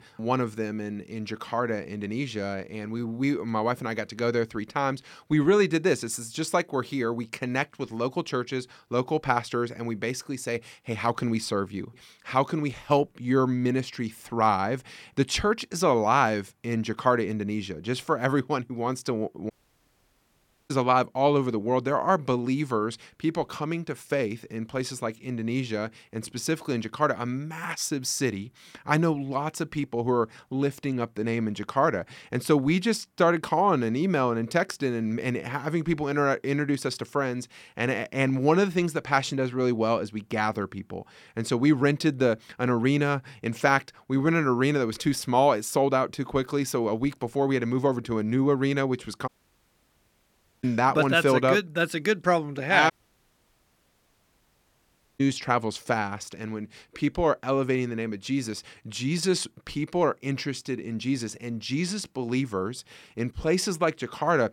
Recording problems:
audio cutting out; at 20 s for 1 s, at 49 s for 1.5 s and at 53 s for 2.5 s

